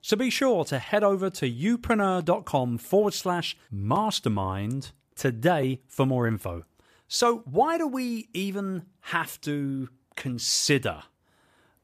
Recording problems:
none

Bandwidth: 14.5 kHz